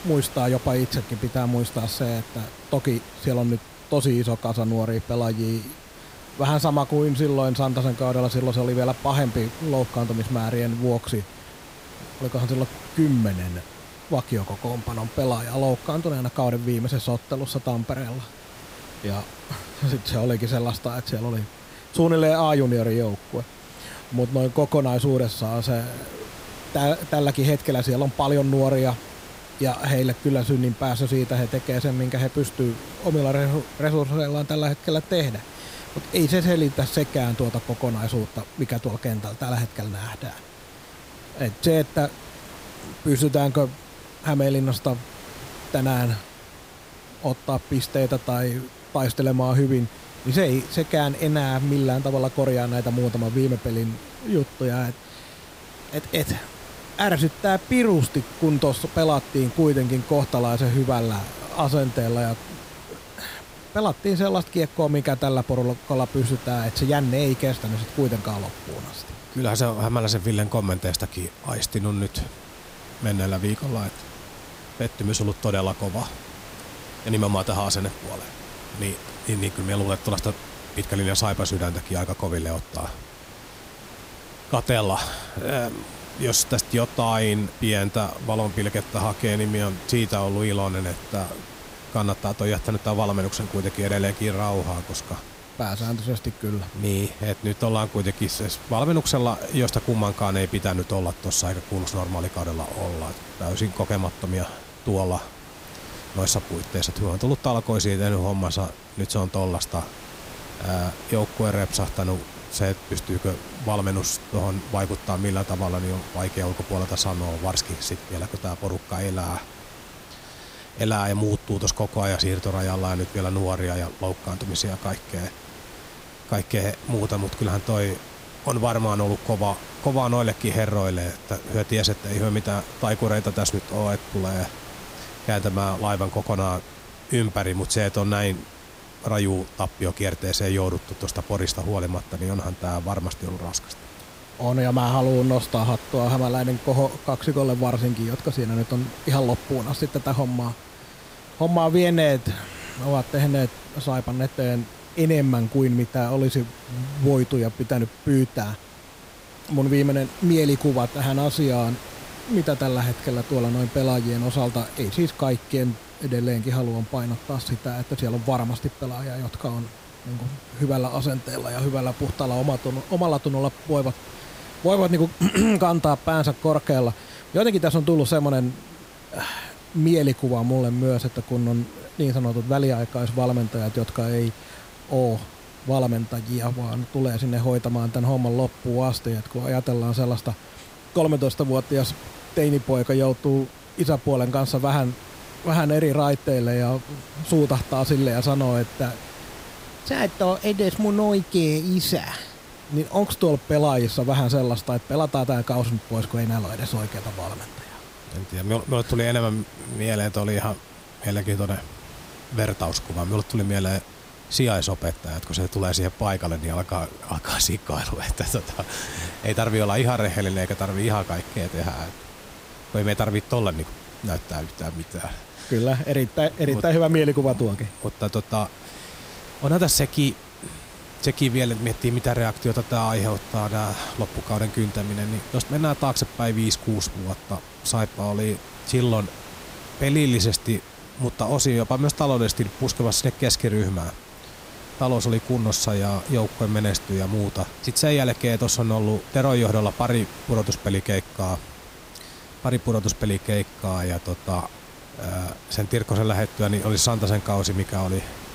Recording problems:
hiss; noticeable; throughout; 15 dB below the speech

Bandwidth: 15.5 kHz